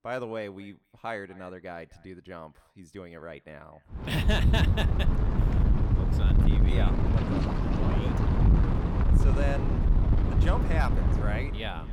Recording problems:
echo of what is said; faint; throughout; 250 ms later, 25 dB below the speech
wind noise on the microphone; heavy; from 4 s on; as loud as the speech

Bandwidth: 18.5 kHz